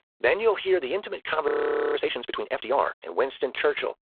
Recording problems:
phone-call audio; poor line
audio freezing; at 1.5 s

